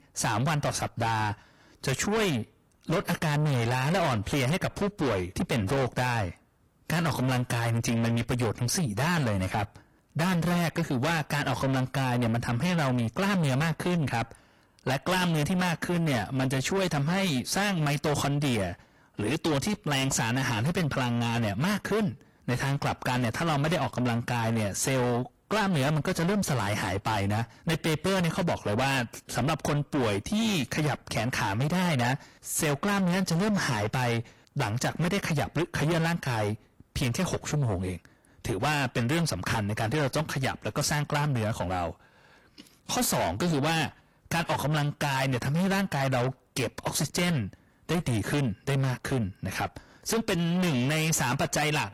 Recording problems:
distortion; heavy; 5 dB below the speech
garbled, watery; slightly

